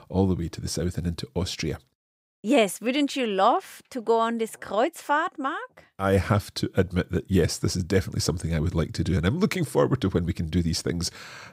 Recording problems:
none

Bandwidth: 15.5 kHz